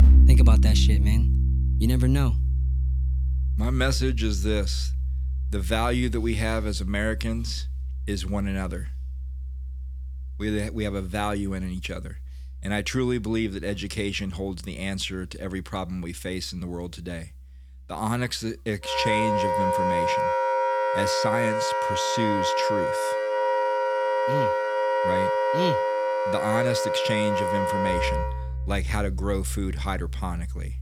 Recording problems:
background music; very loud; throughout; 4 dB above the speech

